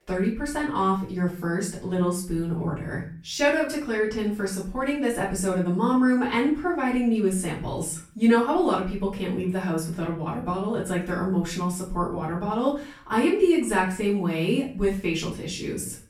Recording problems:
off-mic speech; far
room echo; slight; dies away in 0.4 s

